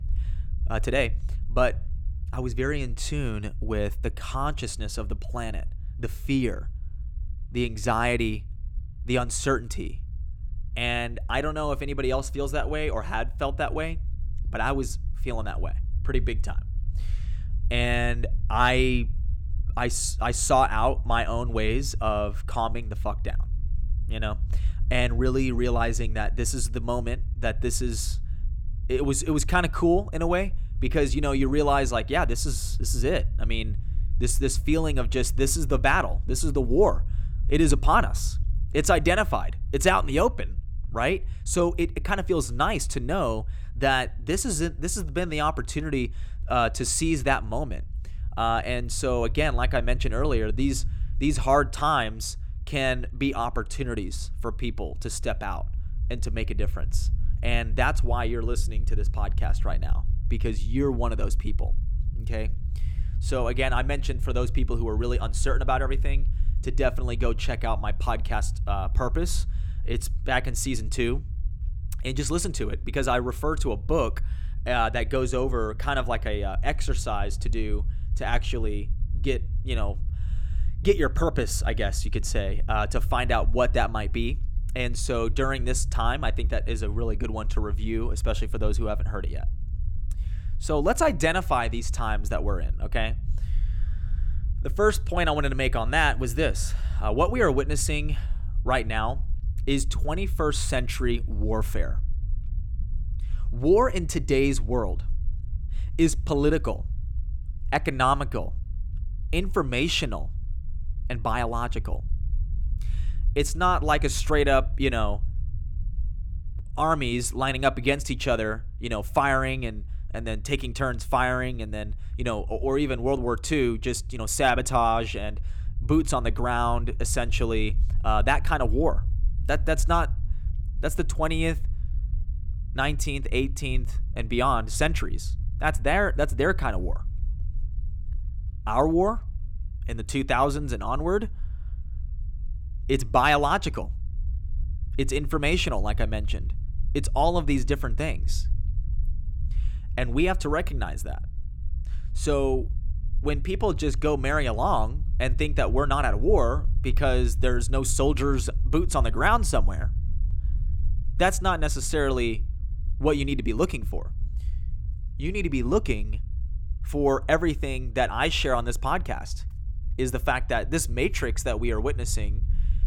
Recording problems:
low rumble; faint; throughout; 25 dB below the speech

